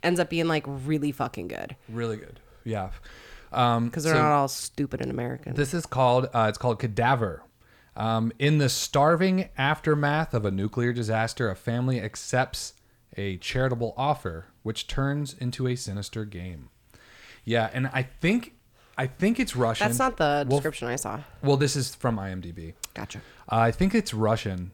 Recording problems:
none

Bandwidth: 18.5 kHz